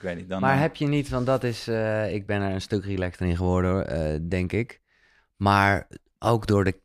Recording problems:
none

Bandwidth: 14.5 kHz